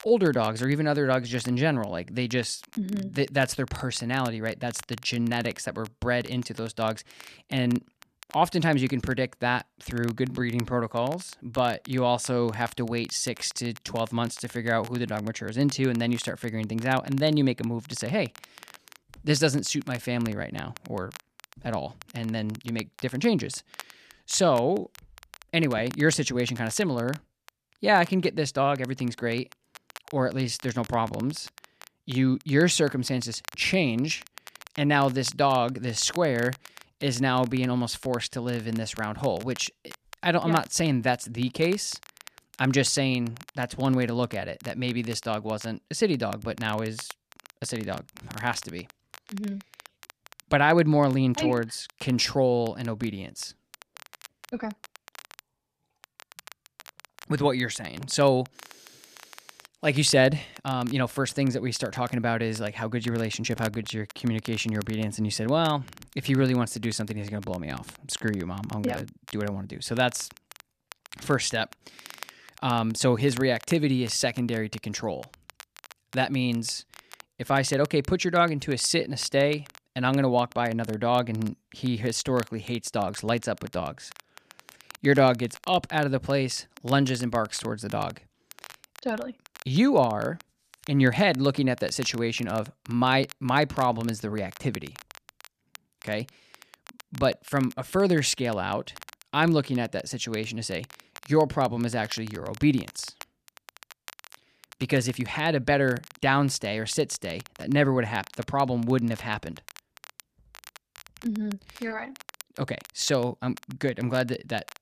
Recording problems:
crackle, like an old record; faint; 20 dB below the speech

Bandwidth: 14.5 kHz